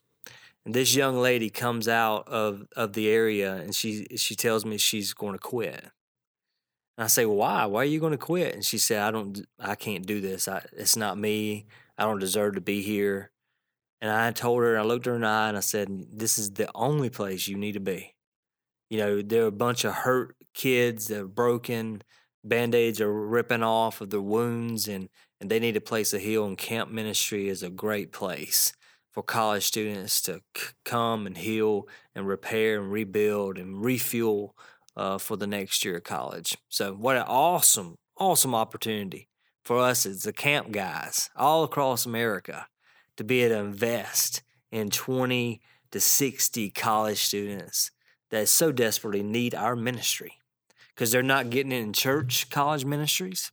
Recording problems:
none

